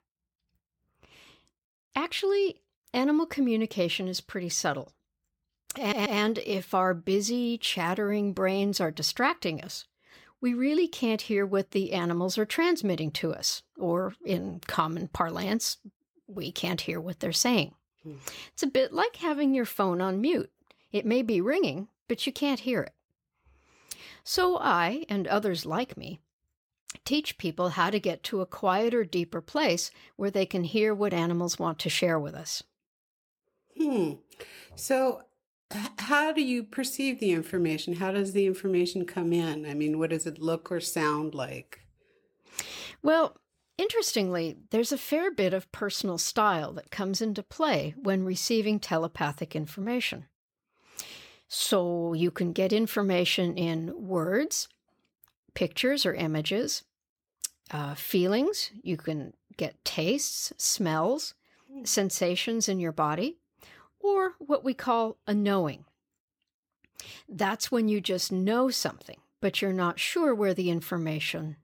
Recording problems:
audio stuttering; at 6 s

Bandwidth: 17 kHz